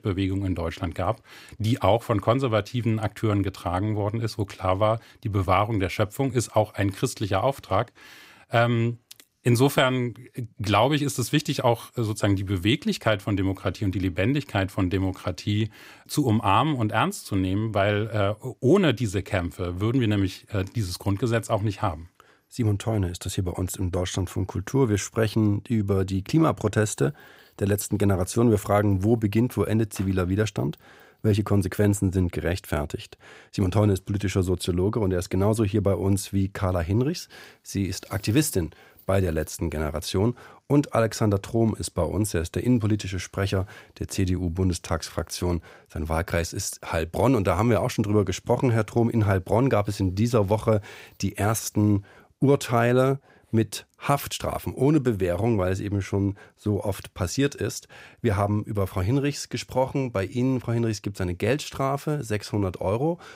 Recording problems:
none

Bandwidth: 15.5 kHz